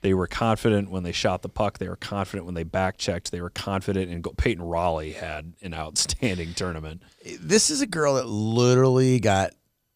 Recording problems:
none

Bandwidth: 15 kHz